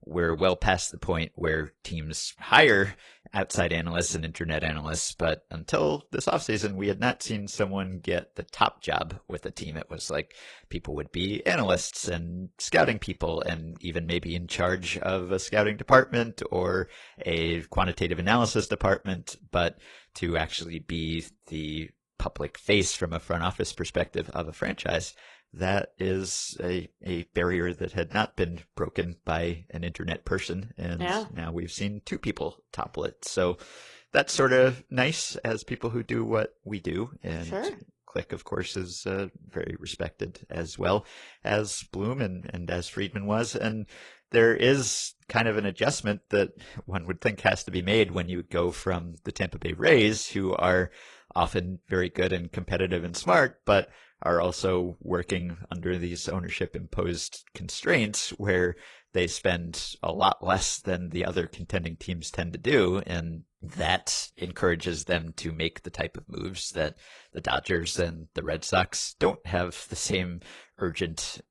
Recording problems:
garbled, watery; slightly; nothing above 10 kHz

